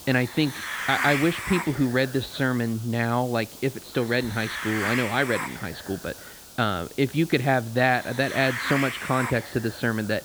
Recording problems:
high frequencies cut off; severe; nothing above 4.5 kHz
hiss; loud; throughout; 7 dB below the speech

